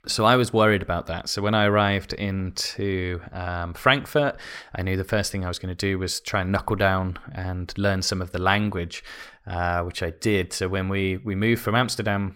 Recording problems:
none

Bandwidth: 16.5 kHz